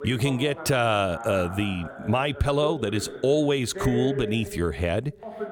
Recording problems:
voice in the background; noticeable; throughout; 10 dB below the speech

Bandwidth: 18.5 kHz